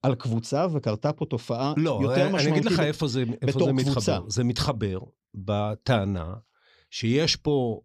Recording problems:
none

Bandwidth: 15 kHz